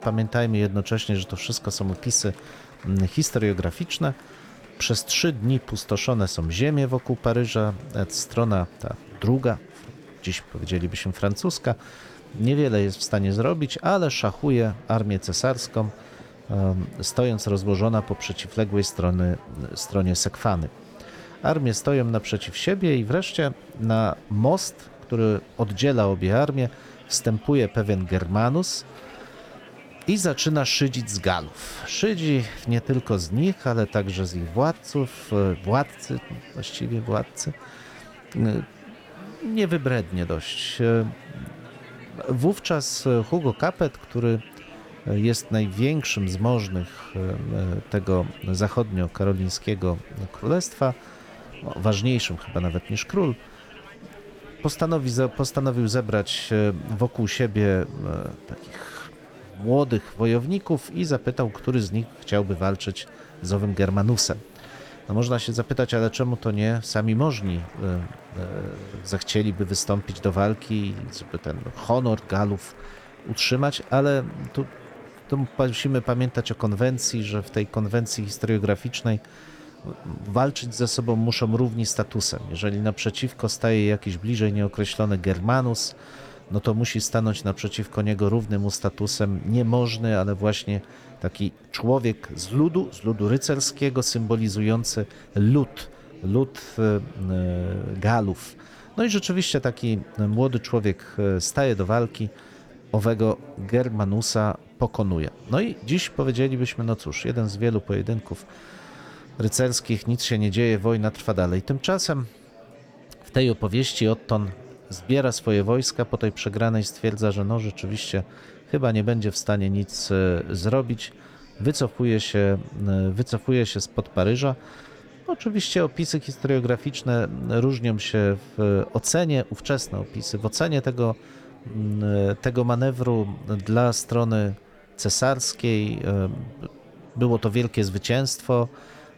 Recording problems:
murmuring crowd; faint; throughout; 20 dB below the speech

